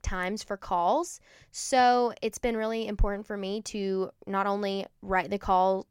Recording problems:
none

